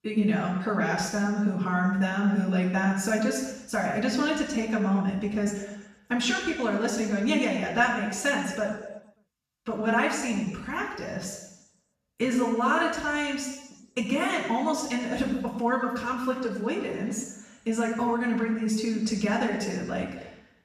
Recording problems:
off-mic speech; far
room echo; noticeable; dies away in 1 s

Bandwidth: 14.5 kHz